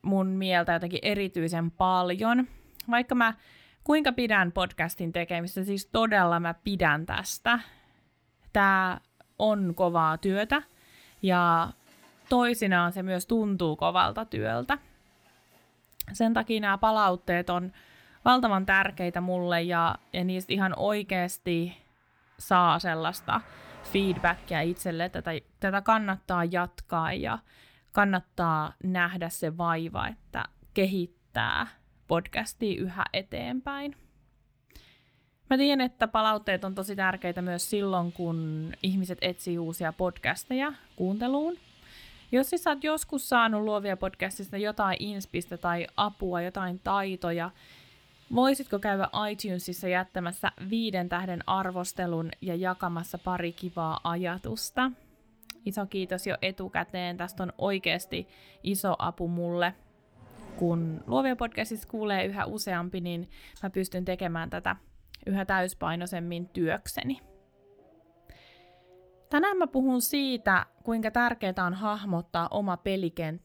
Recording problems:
traffic noise; faint; throughout; 30 dB below the speech

